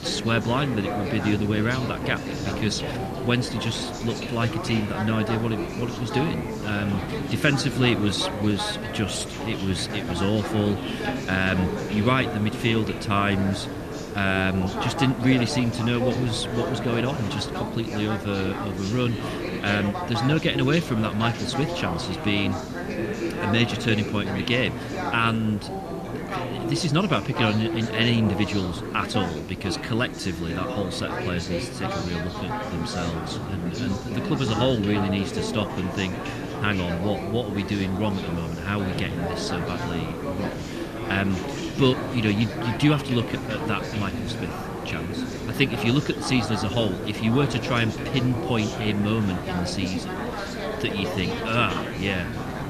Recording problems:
chatter from many people; loud; throughout; 5 dB below the speech
hiss; noticeable; throughout; 10 dB below the speech

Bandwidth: 14 kHz